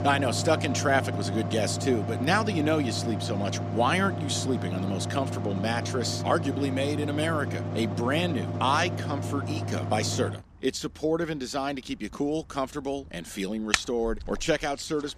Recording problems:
machinery noise; loud; throughout; 3 dB below the speech

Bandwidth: 14.5 kHz